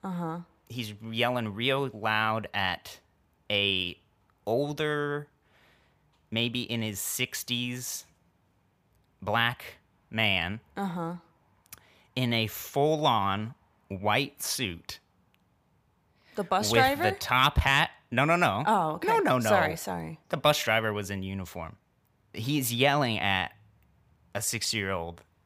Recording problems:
none

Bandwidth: 15 kHz